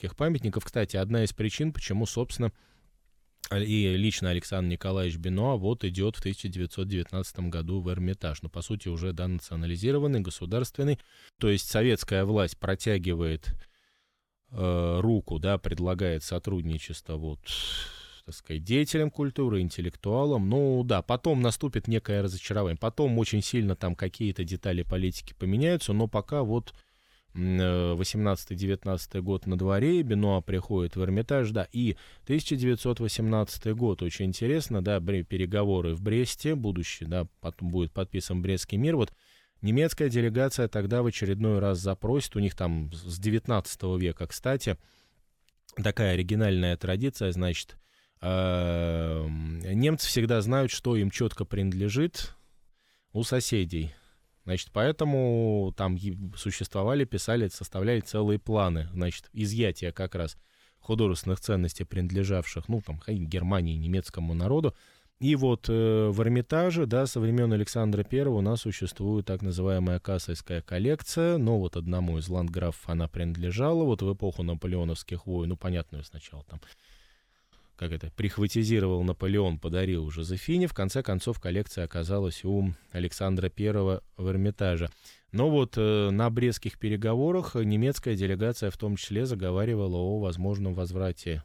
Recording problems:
none

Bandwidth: 19 kHz